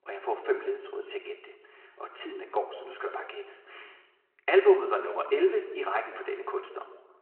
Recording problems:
room echo; slight; dies away in 1.1 s
phone-call audio
off-mic speech; somewhat distant

